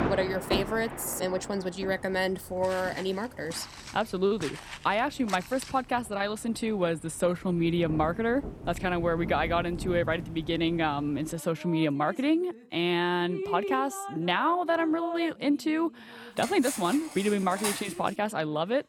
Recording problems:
rain or running water; noticeable; throughout; 10 dB below the speech
footsteps; faint; from 2.5 to 5.5 s; peak 10 dB below the speech
clattering dishes; noticeable; from 16 to 18 s; peak 3 dB below the speech

